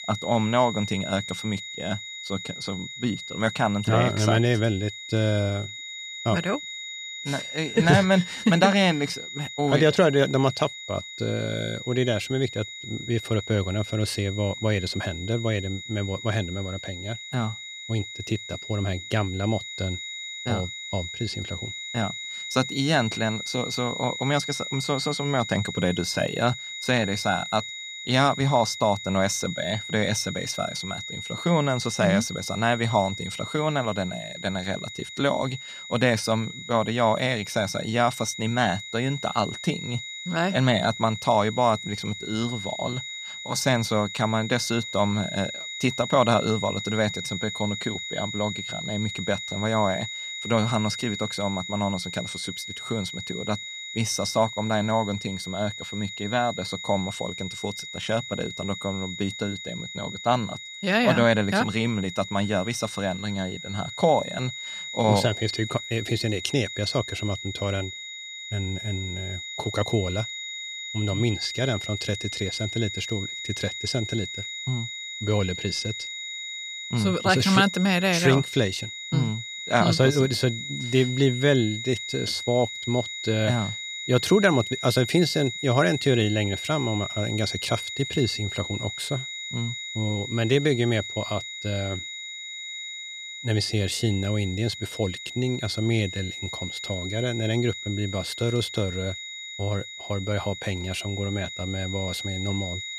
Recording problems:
high-pitched whine; loud; throughout; 4 kHz, 8 dB below the speech

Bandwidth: 14.5 kHz